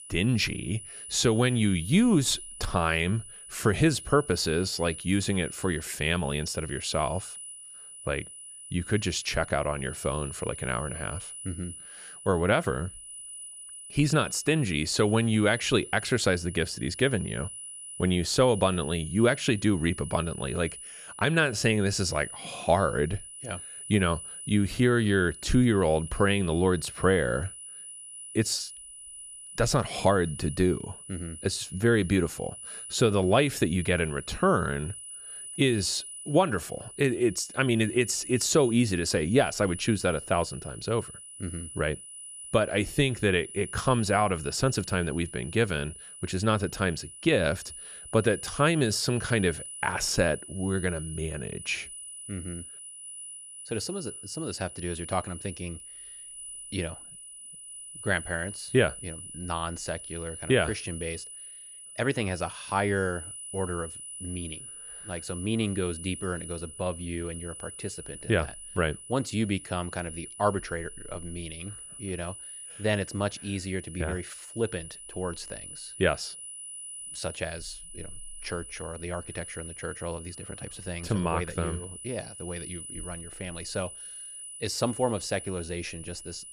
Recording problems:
high-pitched whine; noticeable; throughout; 10 kHz, 10 dB below the speech

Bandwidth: 14.5 kHz